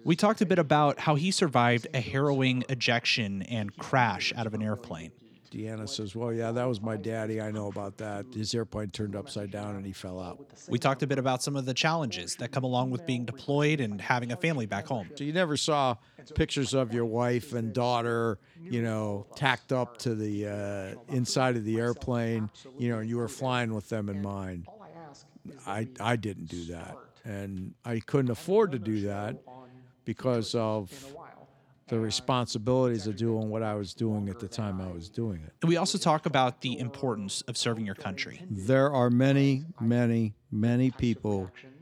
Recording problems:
voice in the background; faint; throughout; 20 dB below the speech

